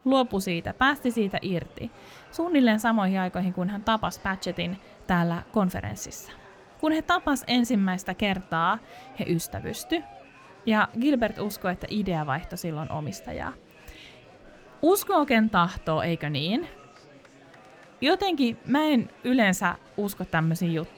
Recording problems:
murmuring crowd; faint; throughout; 25 dB below the speech

